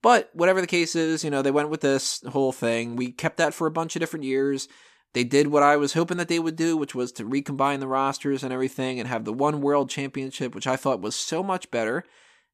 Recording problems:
none

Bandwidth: 14.5 kHz